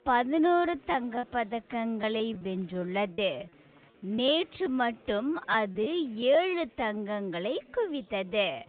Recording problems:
high frequencies cut off; severe; nothing above 4 kHz
wrong speed, natural pitch; too slow; 0.6 times normal speed
chatter from many people; faint; throughout; 30 dB below the speech
choppy; very; at 1 s, from 2 to 5 s and at 5.5 s; 8% of the speech affected

